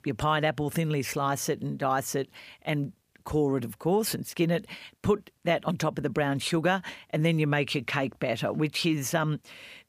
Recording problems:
none

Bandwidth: 15 kHz